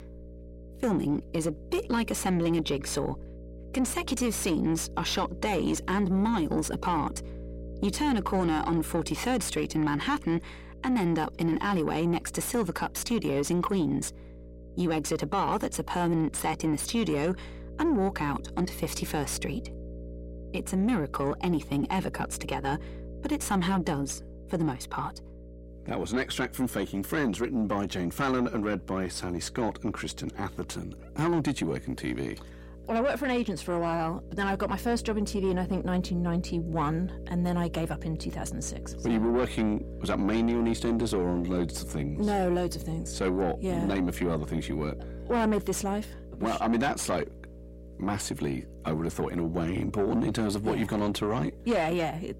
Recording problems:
distortion; slight; 10 dB below the speech
electrical hum; noticeable; throughout; 60 Hz, 20 dB below the speech

